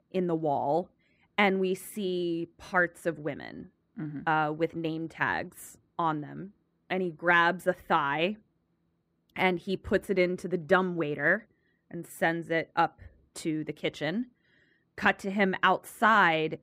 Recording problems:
muffled; slightly; fading above 3 kHz

